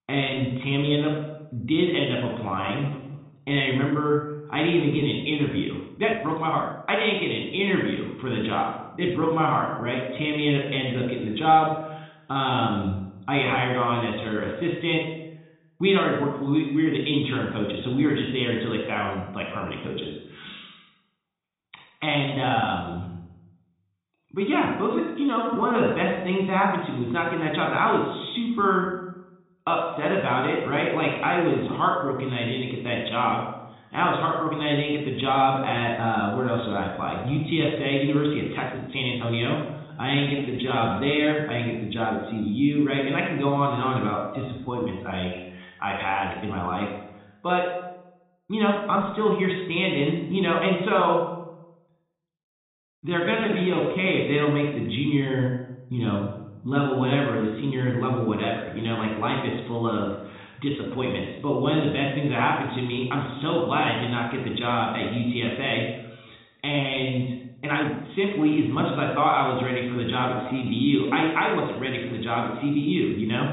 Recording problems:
high frequencies cut off; severe; nothing above 4 kHz
room echo; noticeable; dies away in 0.7 s
off-mic speech; somewhat distant
uneven, jittery; strongly; from 2 s to 1:11

